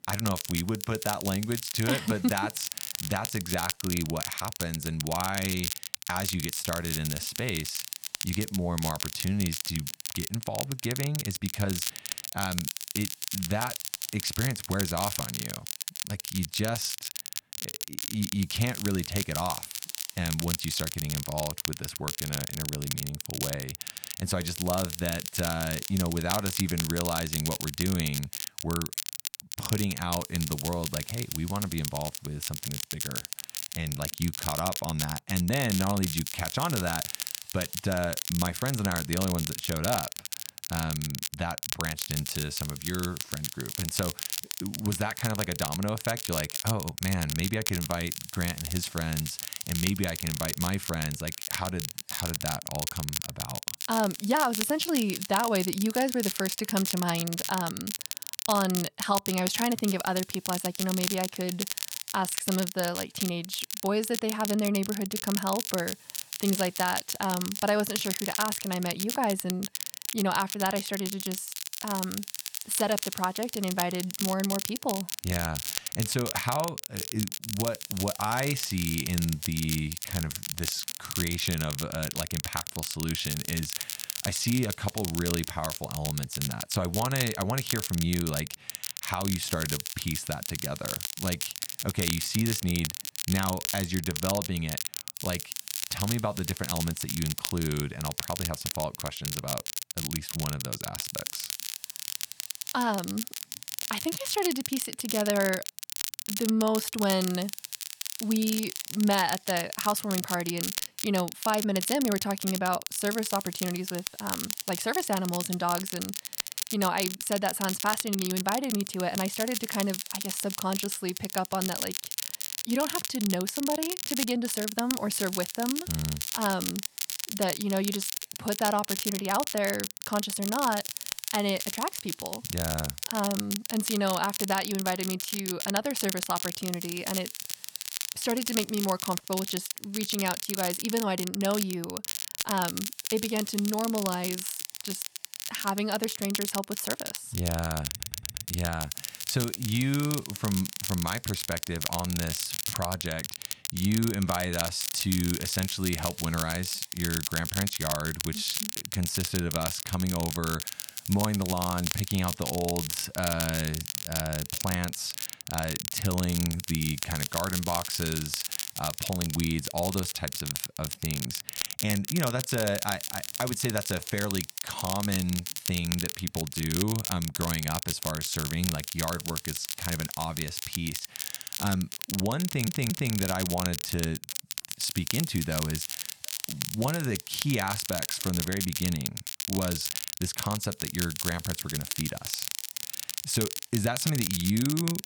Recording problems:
crackle, like an old record; loud; 2 dB below the speech
hiss; faint; throughout; 25 dB below the speech
audio stuttering; at 2:28 and at 3:02

